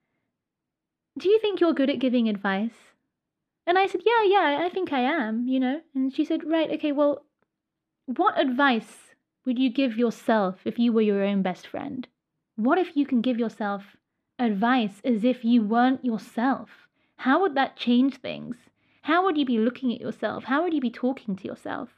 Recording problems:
muffled; slightly; fading above 3.5 kHz

